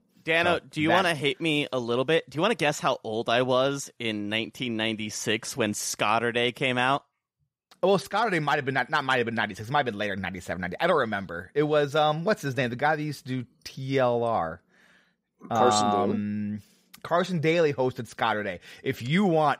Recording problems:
none

